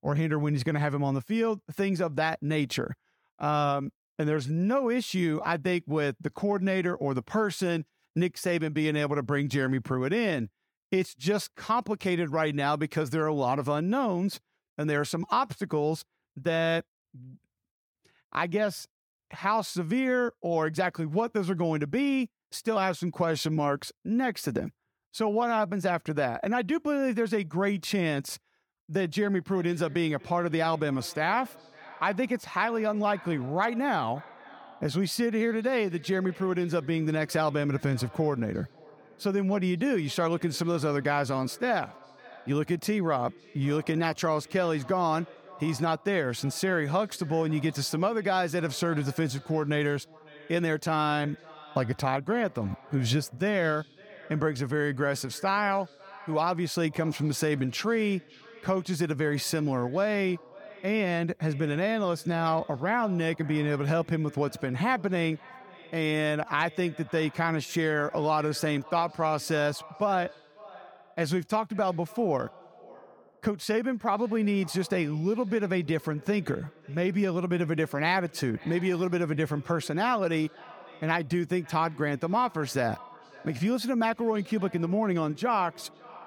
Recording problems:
echo of what is said; faint; from 29 s on; 550 ms later, 20 dB below the speech

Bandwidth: 18.5 kHz